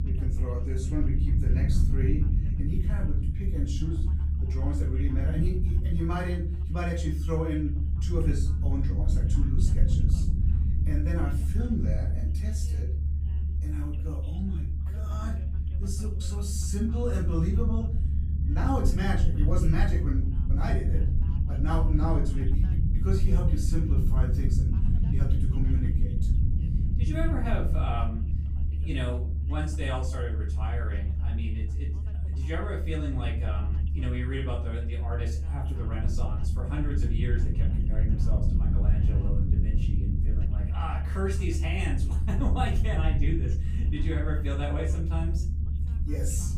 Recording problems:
off-mic speech; far
room echo; slight; dies away in 0.4 s
low rumble; loud; throughout; 6 dB below the speech
voice in the background; faint; throughout; 25 dB below the speech

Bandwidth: 15.5 kHz